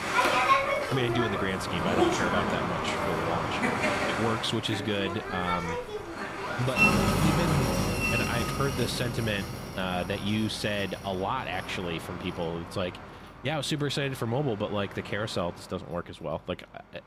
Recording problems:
train or aircraft noise; very loud; throughout; 3 dB above the speech

